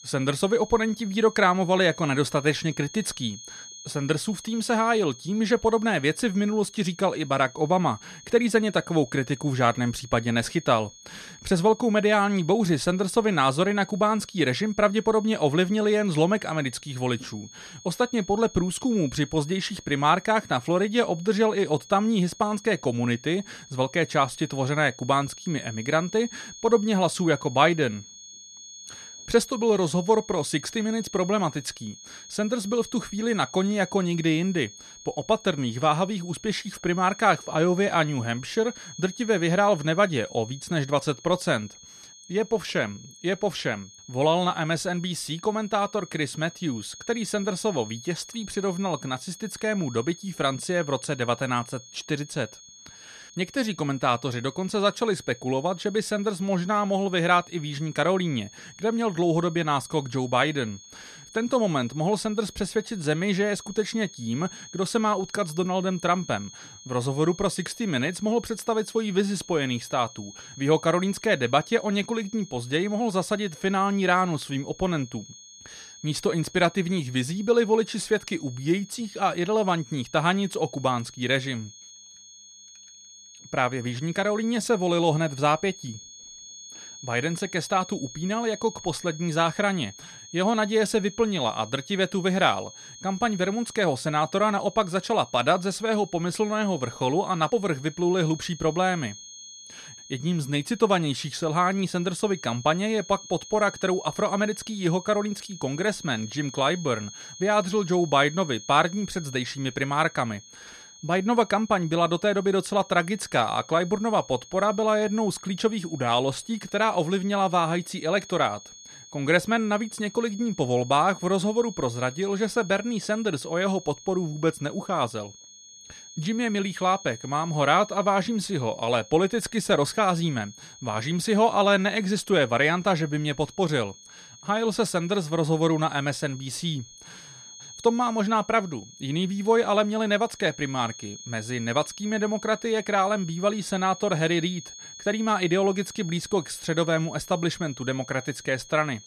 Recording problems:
high-pitched whine; noticeable; throughout; 6.5 kHz, 20 dB below the speech

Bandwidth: 13.5 kHz